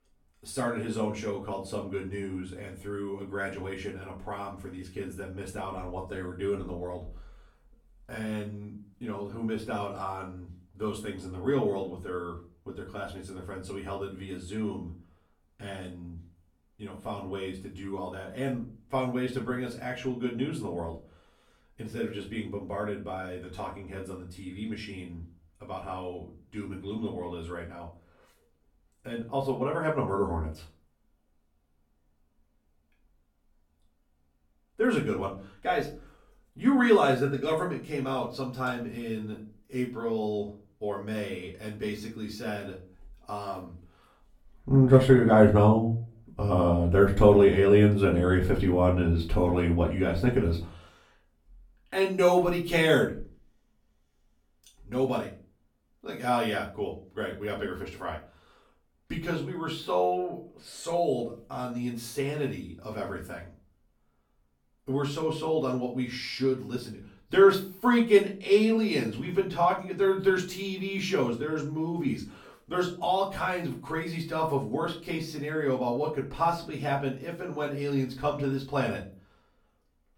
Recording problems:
off-mic speech; far
room echo; slight; dies away in 0.3 s

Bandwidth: 18 kHz